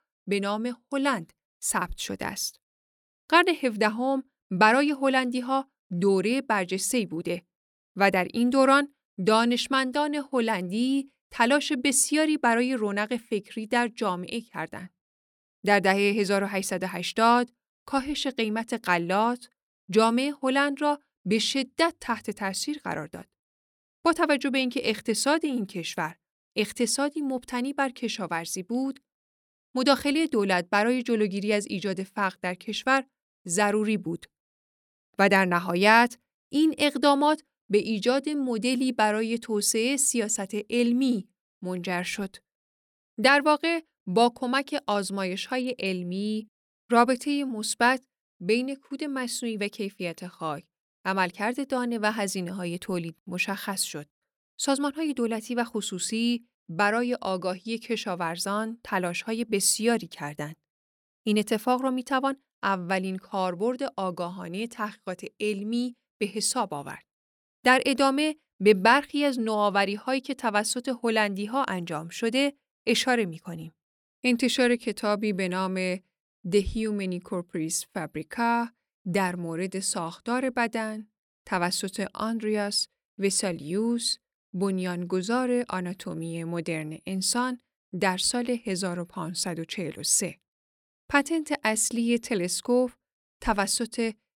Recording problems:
none

